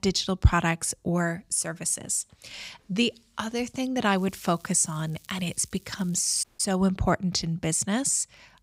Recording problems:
crackling; faint; from 4 to 6.5 s; 25 dB below the speech
audio cutting out; at 6.5 s

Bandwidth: 15.5 kHz